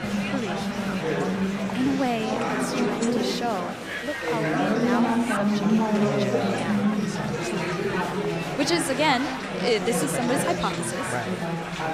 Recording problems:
chatter from many people; very loud; throughout; 3 dB above the speech

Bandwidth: 15 kHz